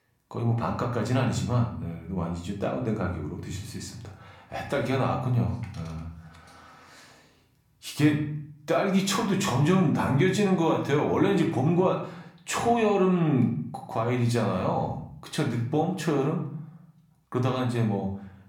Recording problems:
room echo; slight; dies away in 0.6 s
off-mic speech; somewhat distant

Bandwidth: 17.5 kHz